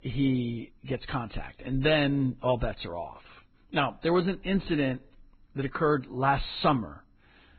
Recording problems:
garbled, watery; badly; nothing above 4 kHz

